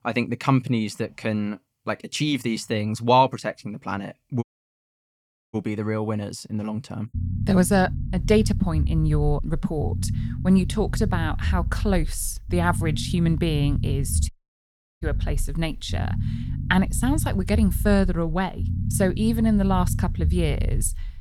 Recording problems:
low rumble; noticeable; from 7 s on; 15 dB below the speech
audio cutting out; at 4.5 s for 1 s and at 14 s for 0.5 s

